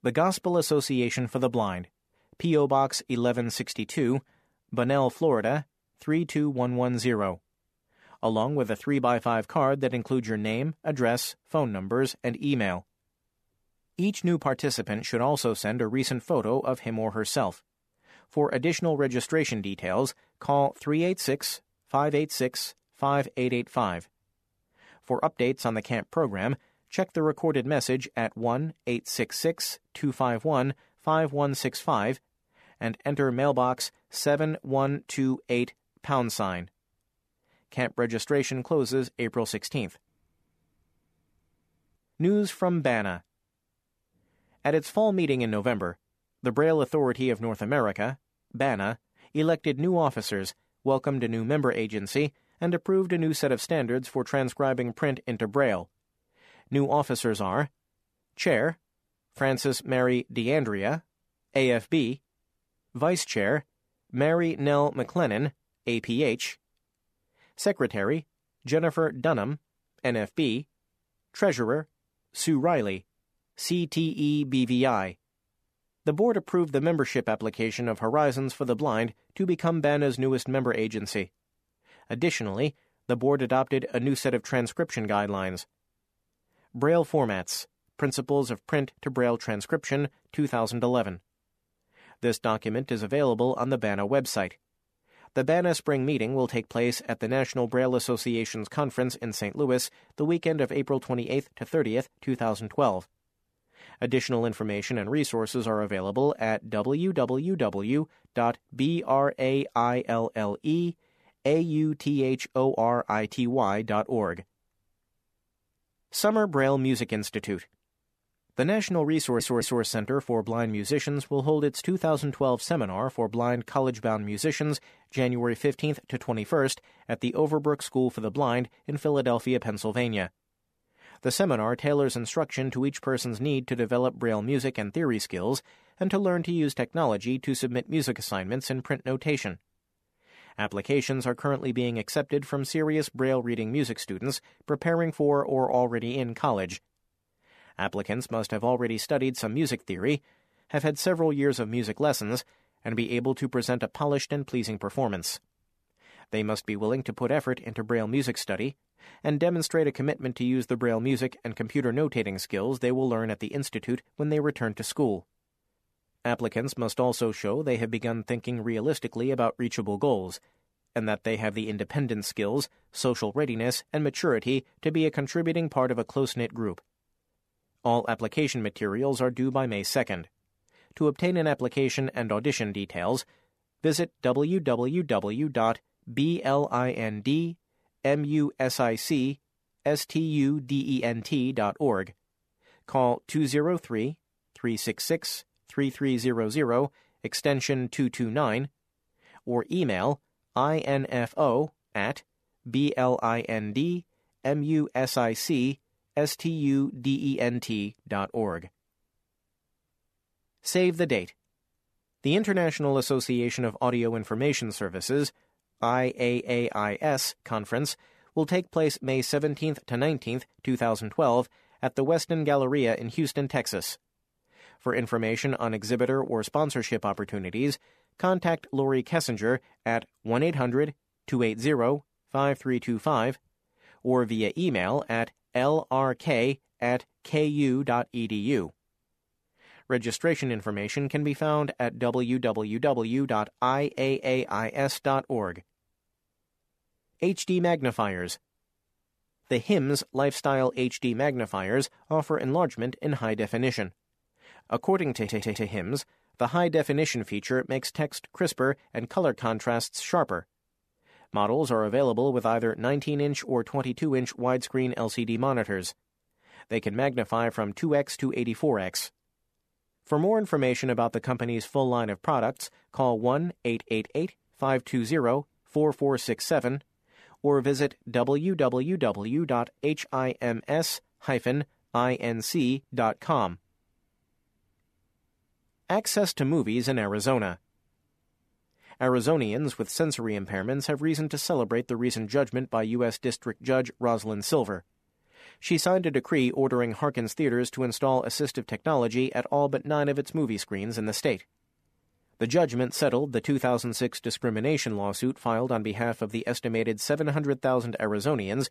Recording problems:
audio stuttering; at 1:59 and at 4:15

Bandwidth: 14.5 kHz